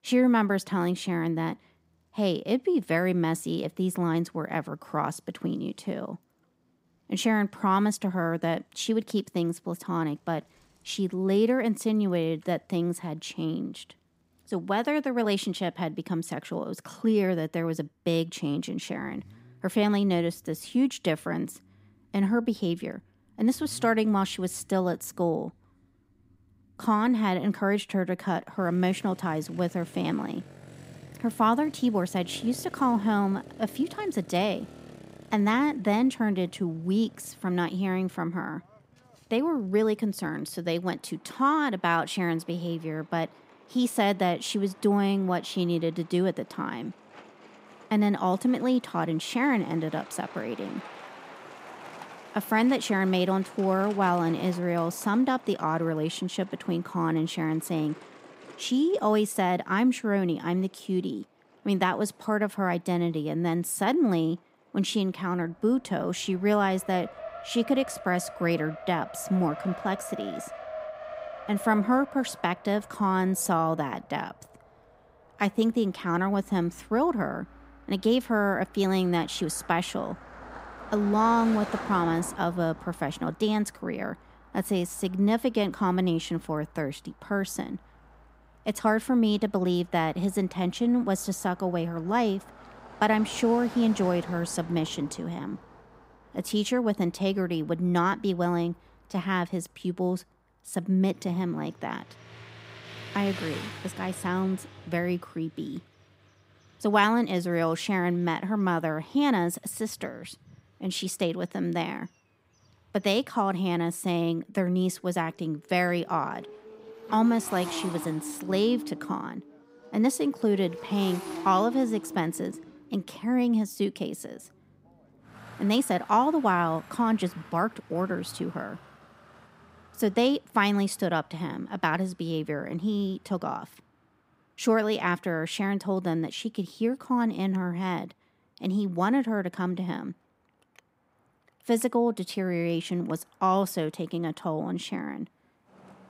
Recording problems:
traffic noise; noticeable; throughout; 15 dB below the speech

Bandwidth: 15.5 kHz